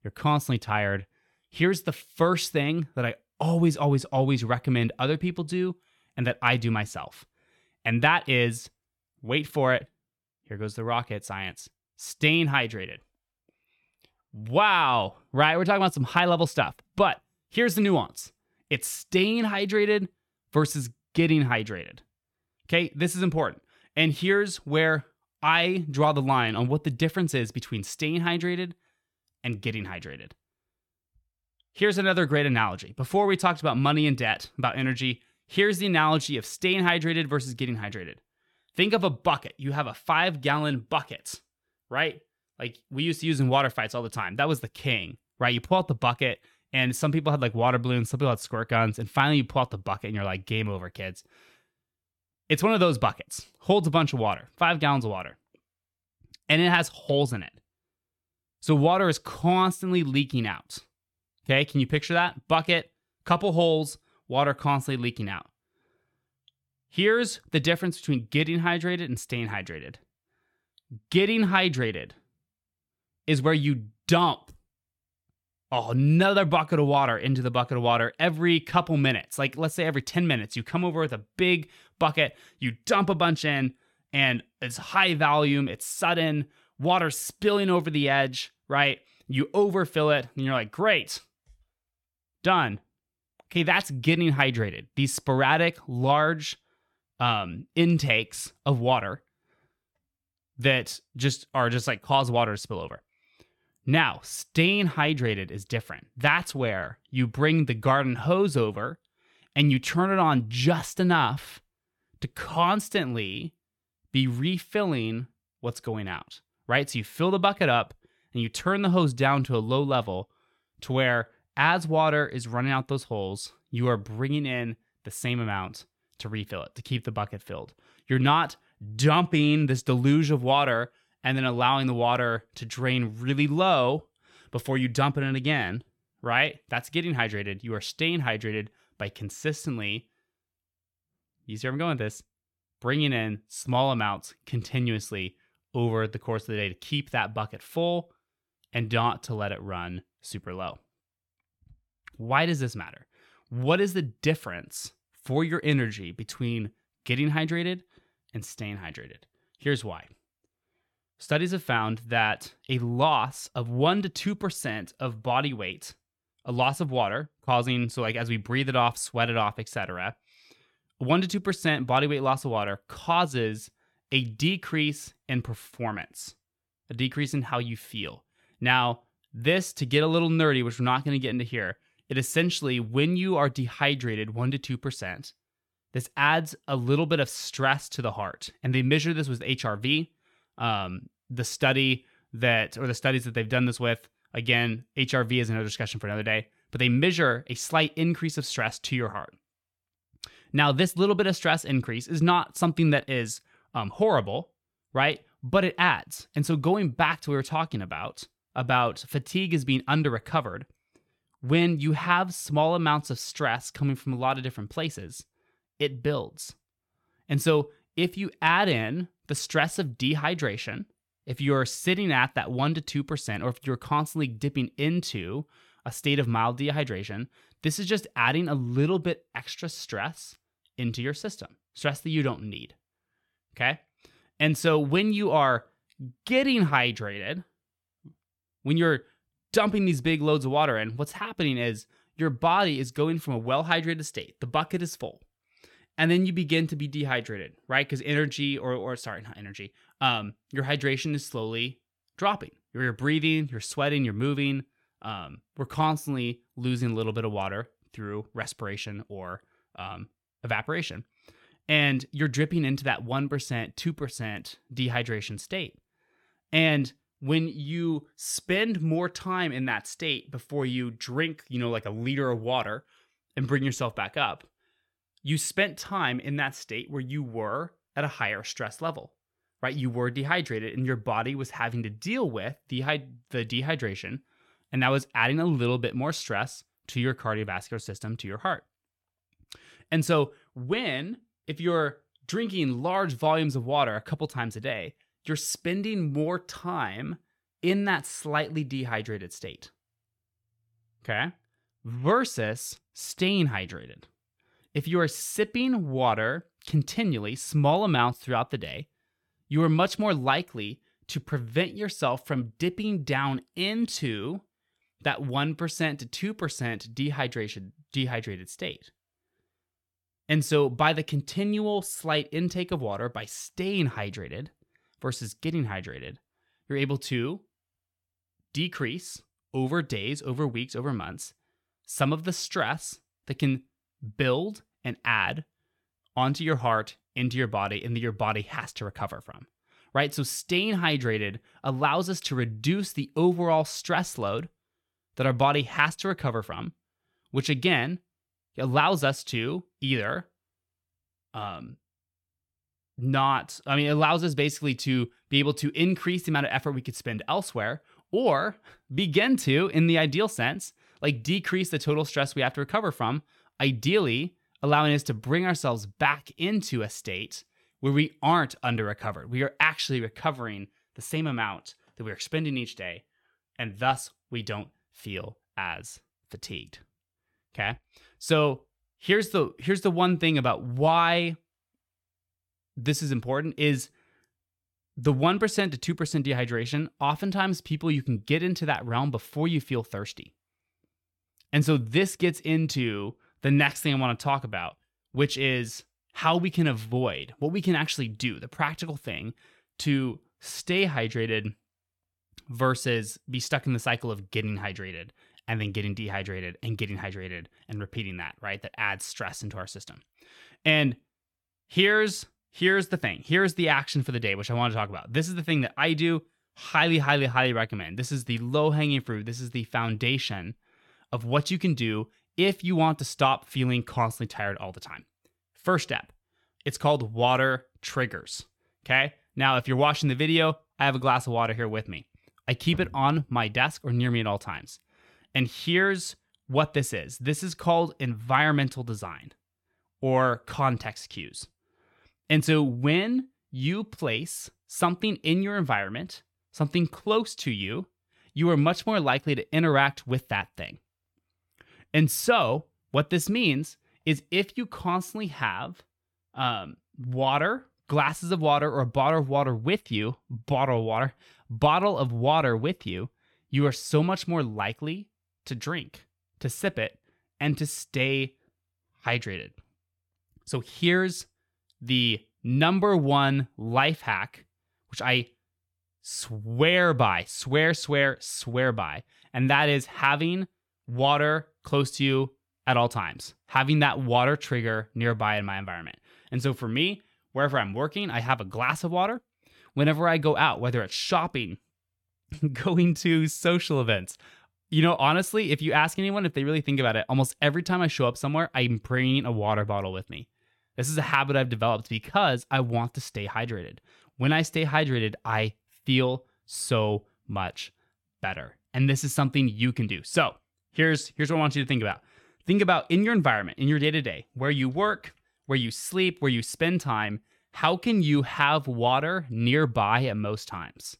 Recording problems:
none

